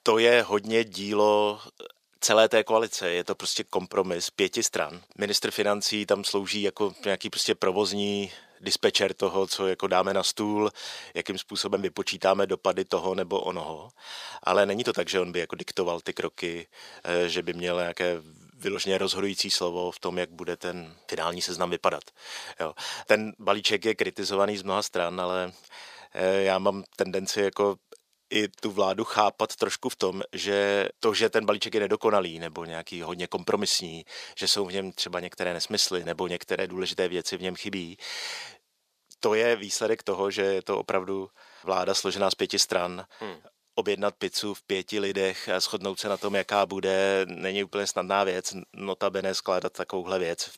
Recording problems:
thin; very; fading below 500 Hz

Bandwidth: 15 kHz